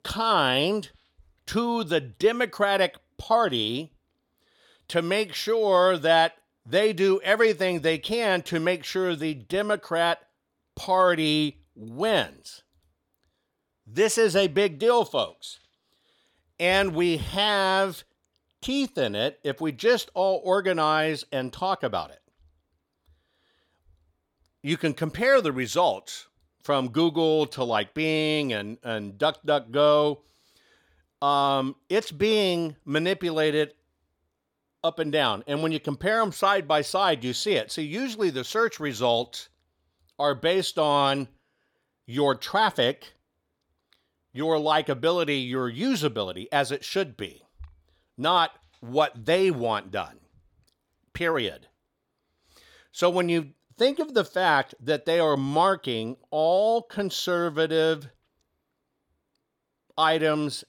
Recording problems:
none

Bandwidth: 17.5 kHz